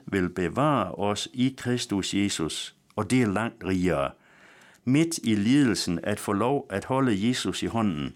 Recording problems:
none

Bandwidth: 17 kHz